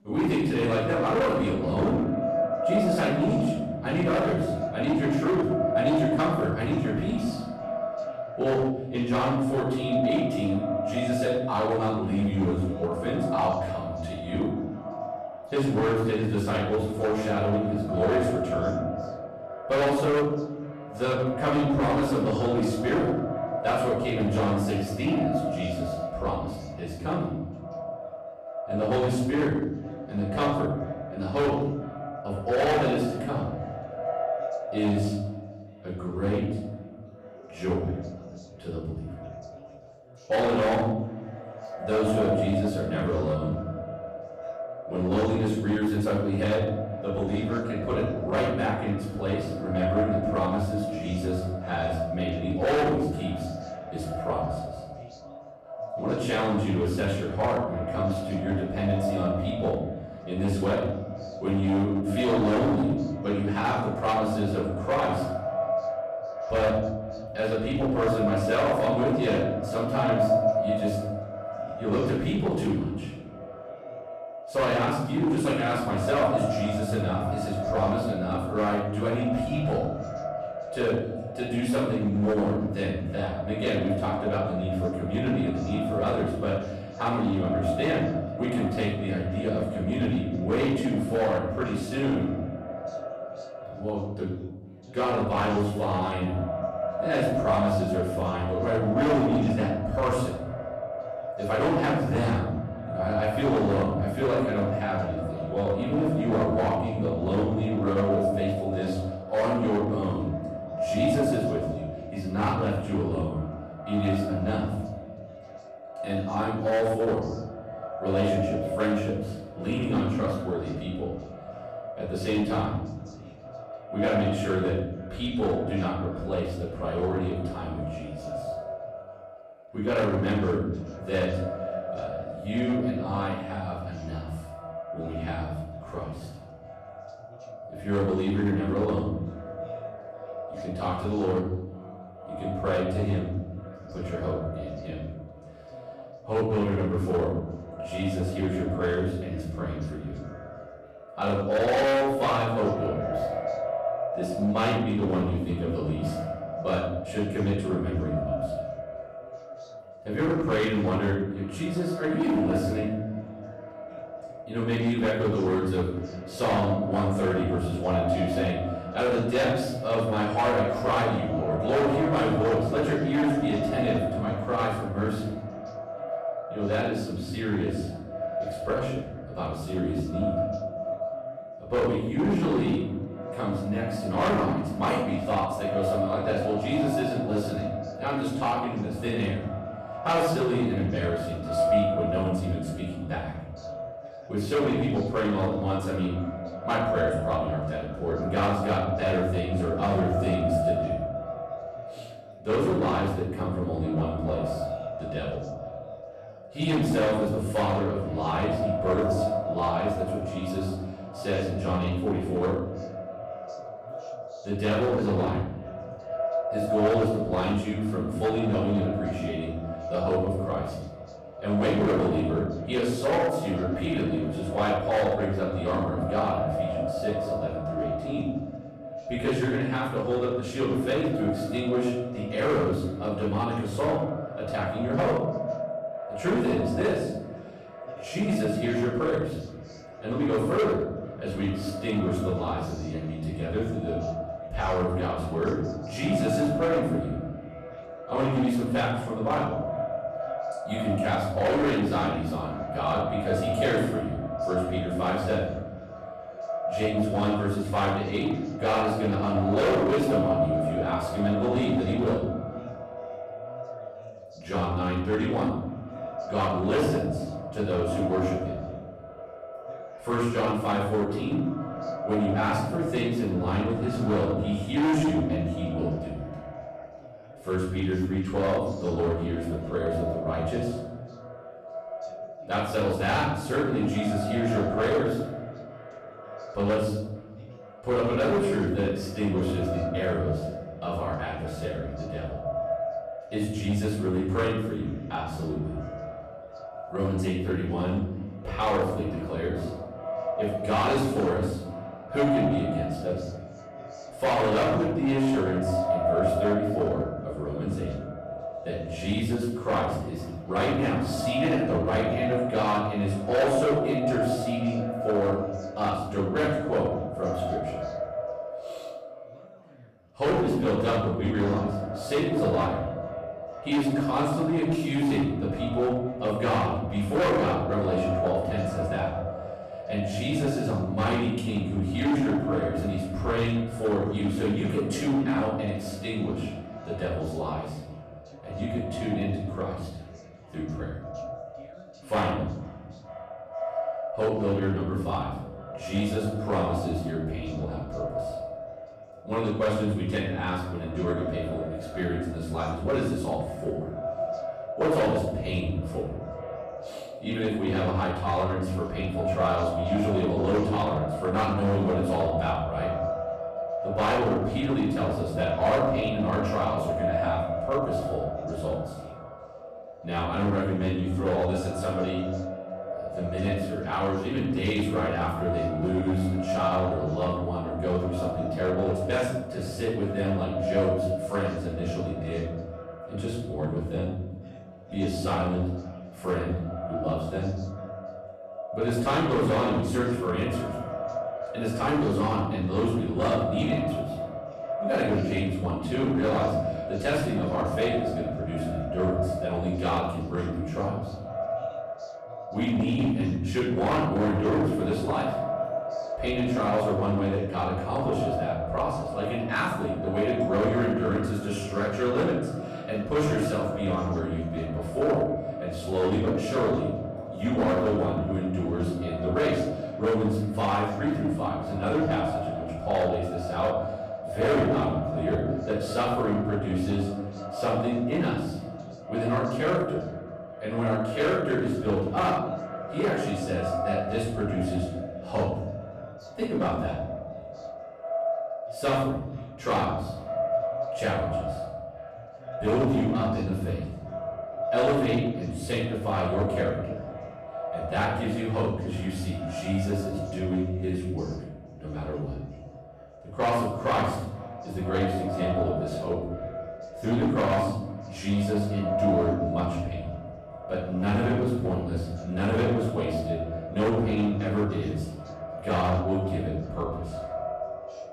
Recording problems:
echo of what is said; strong; throughout; 450 ms later, 7 dB below the speech
off-mic speech; far
room echo; noticeable; dies away in 1 s
distortion; slight; 7% of the sound clipped
background chatter; faint; throughout; 3 voices, 25 dB below the speech

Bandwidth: 14 kHz